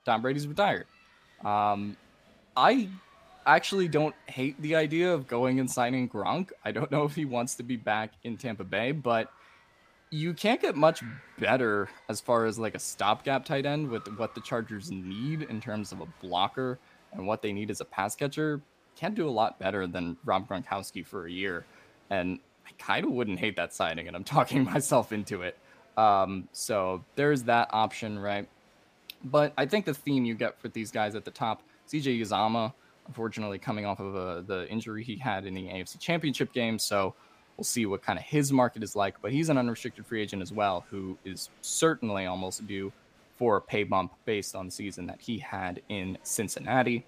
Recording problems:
crowd noise; faint; throughout; 30 dB below the speech

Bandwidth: 15 kHz